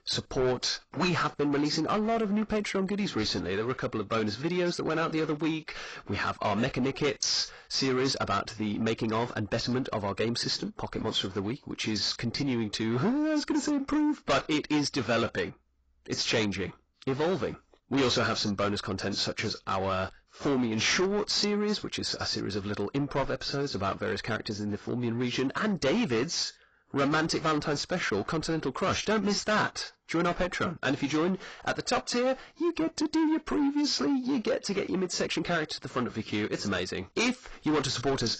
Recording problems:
distortion; heavy; 7 dB below the speech
garbled, watery; badly; nothing above 7.5 kHz

